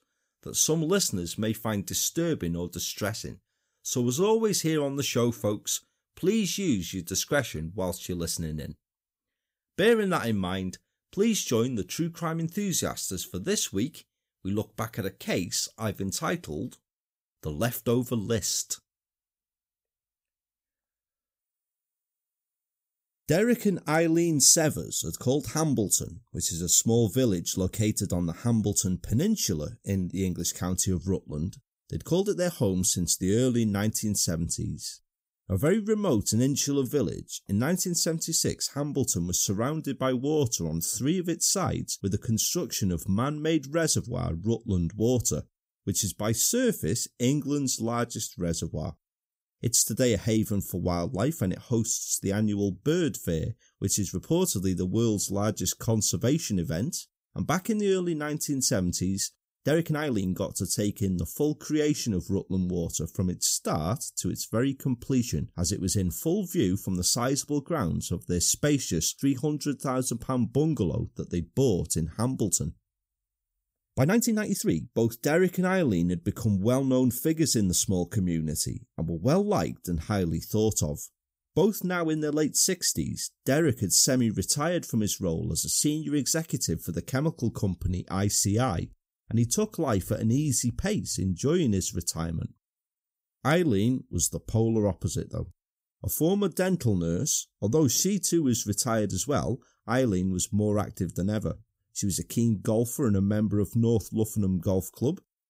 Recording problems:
uneven, jittery; strongly; from 3.5 s to 1:22

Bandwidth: 15.5 kHz